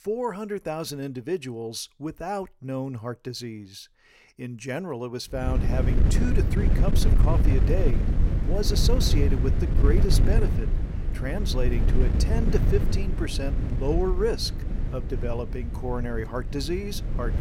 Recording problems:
wind noise on the microphone; heavy; from 5.5 s on; 6 dB below the speech

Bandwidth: 16 kHz